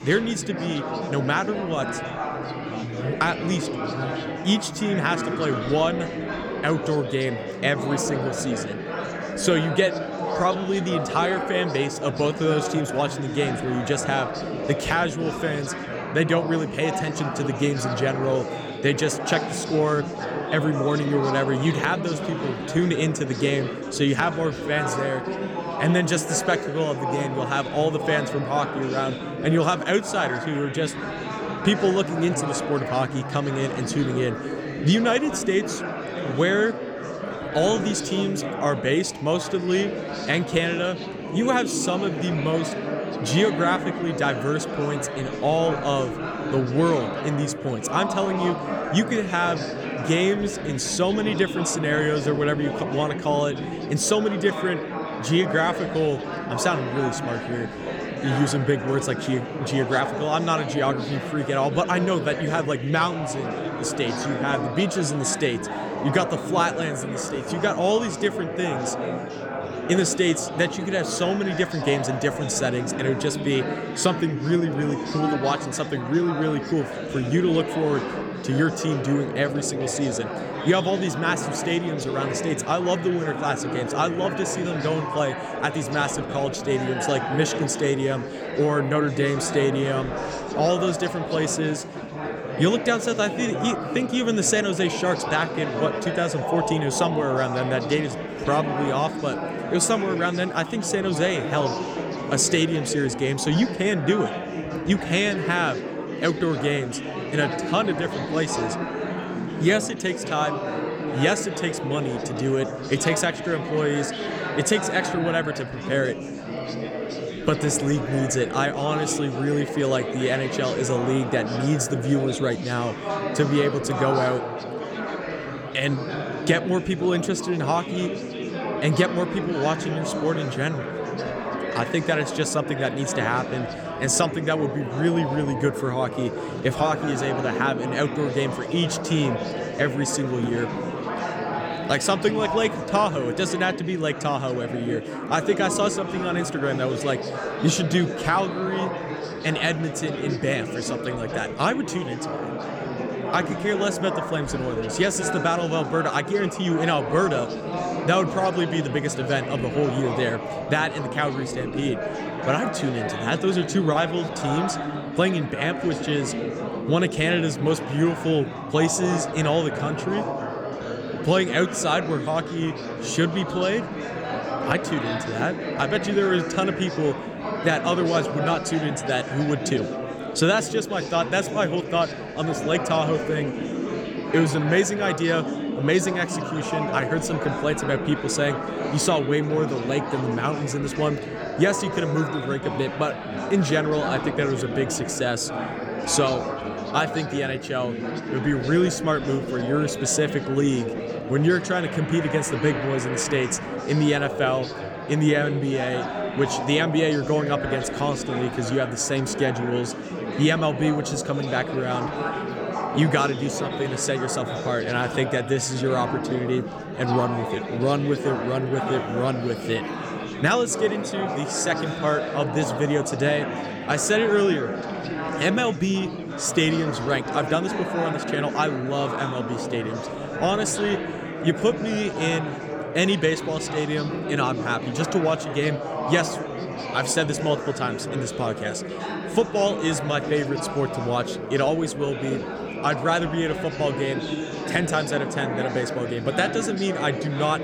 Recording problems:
chatter from many people; loud; throughout; 5 dB below the speech

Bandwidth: 18 kHz